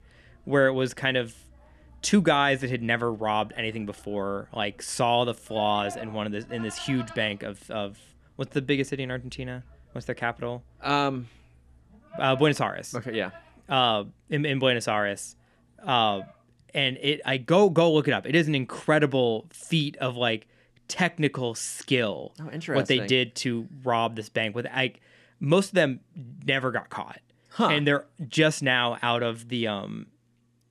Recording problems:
animal sounds; faint; throughout; 20 dB below the speech

